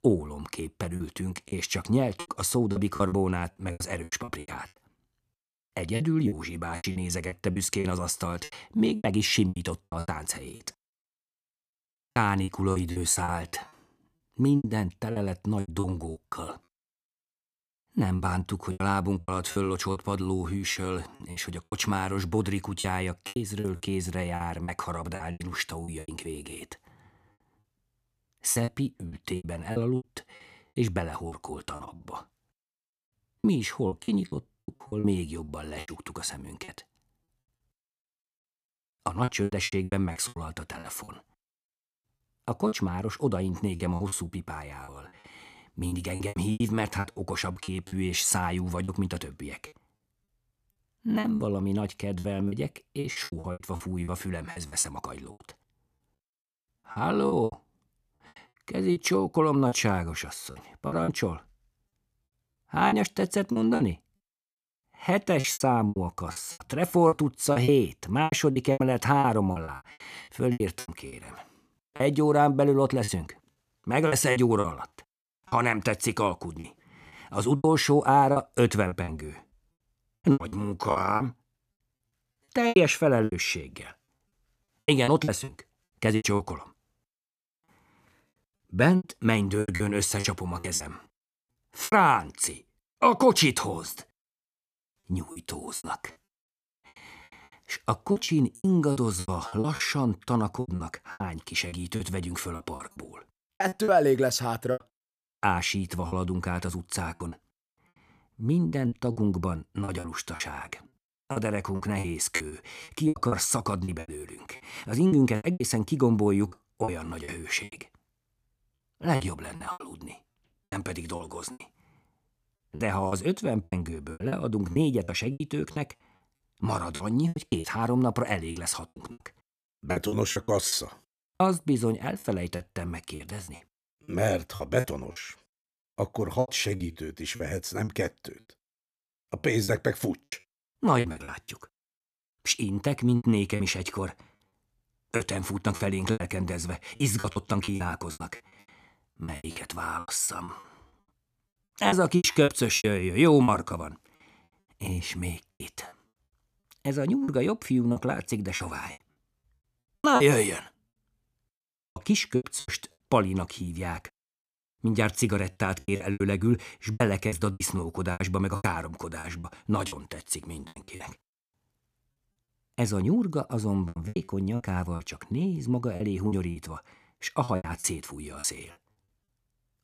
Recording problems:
choppy; very; 14% of the speech affected

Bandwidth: 14.5 kHz